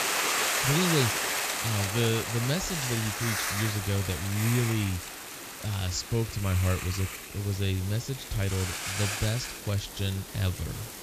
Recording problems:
high frequencies cut off; noticeable; nothing above 7.5 kHz
hiss; loud; throughout; 1 dB below the speech

